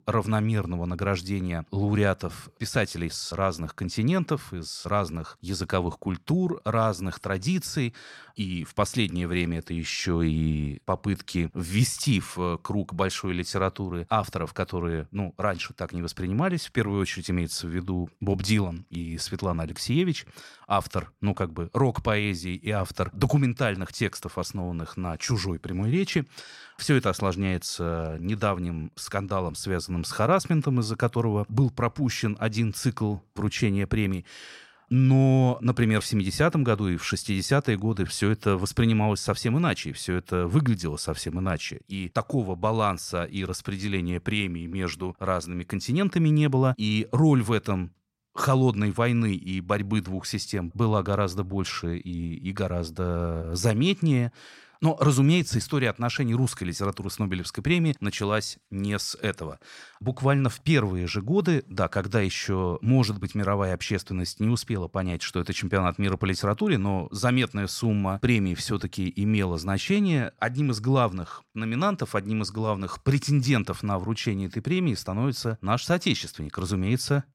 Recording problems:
none

